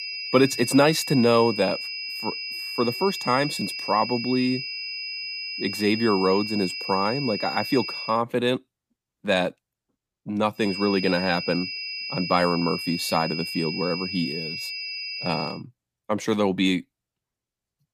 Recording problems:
high-pitched whine; loud; until 8 s and from 11 to 16 s; 5 kHz, 6 dB below the speech

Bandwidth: 15 kHz